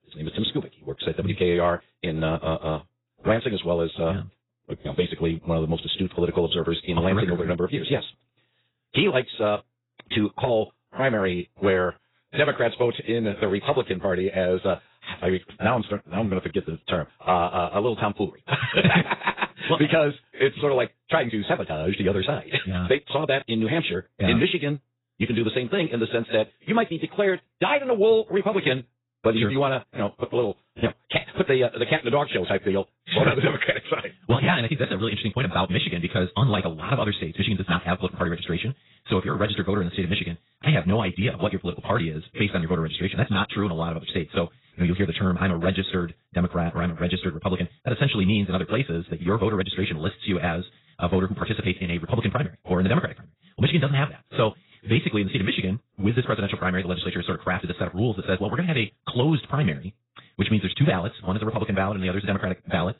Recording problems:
garbled, watery; badly; nothing above 4 kHz
wrong speed, natural pitch; too fast; 1.7 times normal speed

